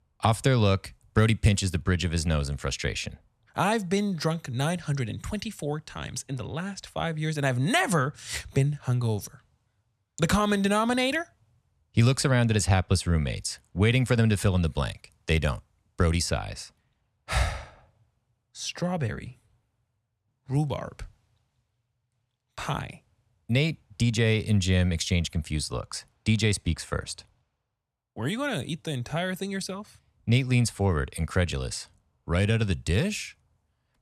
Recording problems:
none

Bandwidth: 14 kHz